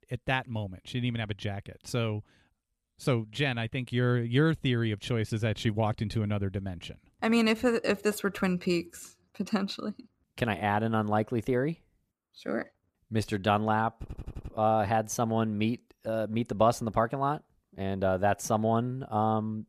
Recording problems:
audio stuttering; at 14 s

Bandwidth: 14.5 kHz